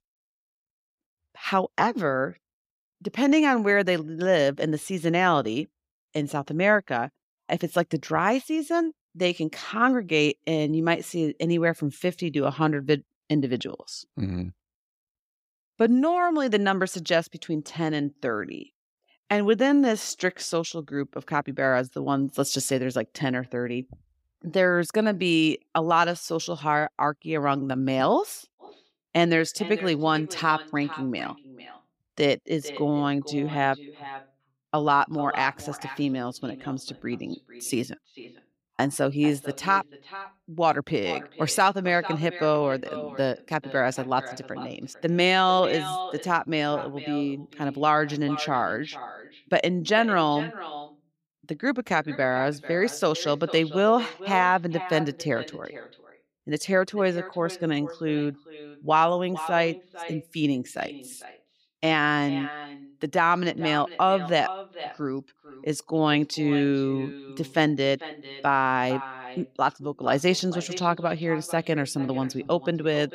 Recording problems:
echo of what is said; noticeable; from 29 s on; 450 ms later, 15 dB below the speech

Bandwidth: 15.5 kHz